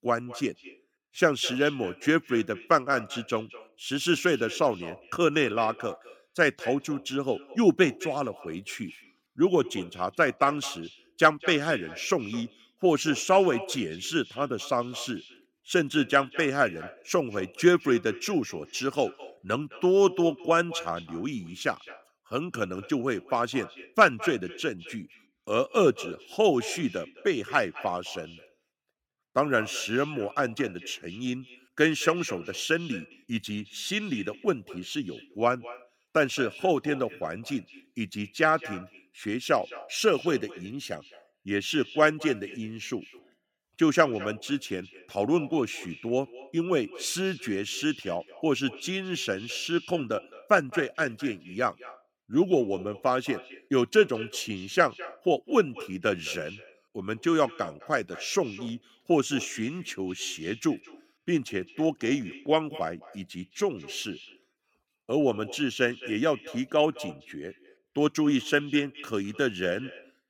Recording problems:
echo of what is said; noticeable; throughout; 210 ms later, 15 dB below the speech

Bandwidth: 17 kHz